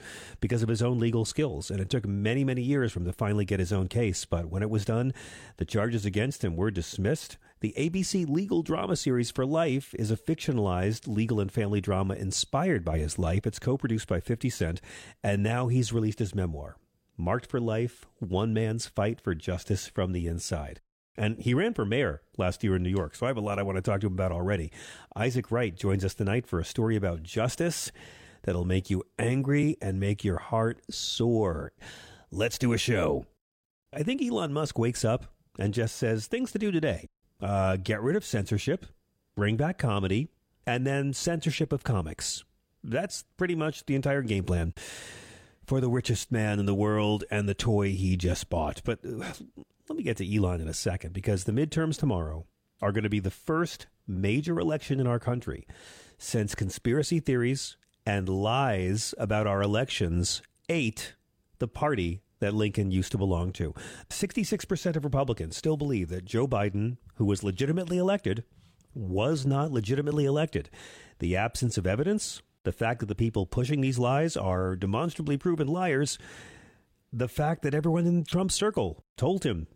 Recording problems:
none

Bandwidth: 16 kHz